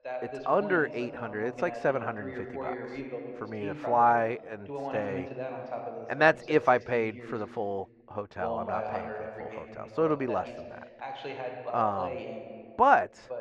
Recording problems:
muffled; very; fading above 2 kHz
voice in the background; noticeable; throughout; 10 dB below the speech

